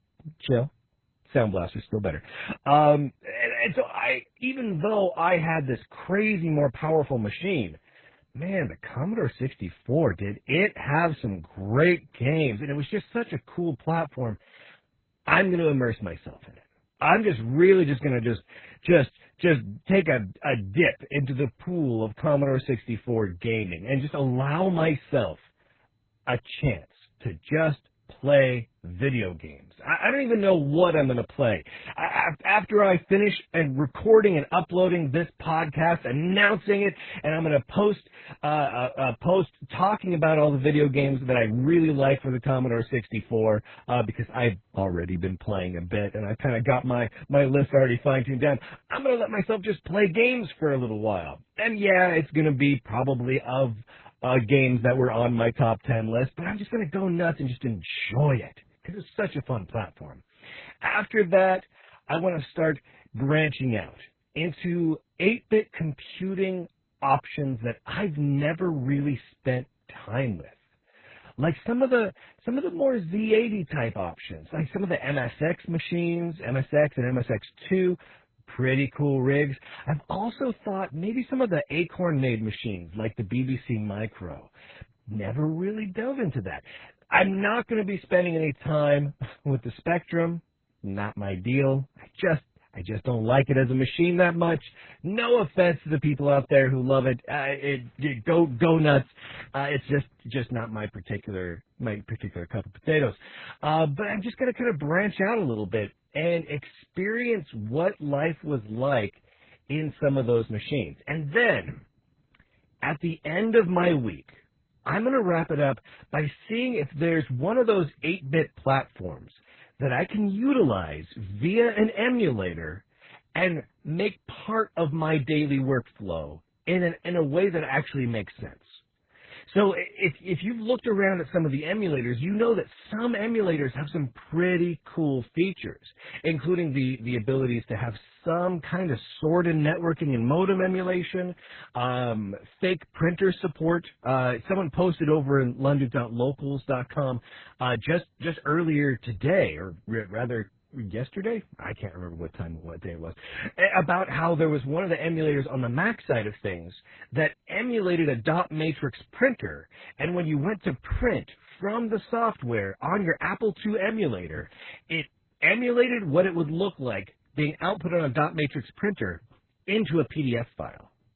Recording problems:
garbled, watery; badly; nothing above 4 kHz
muffled; very slightly; fading above 2.5 kHz

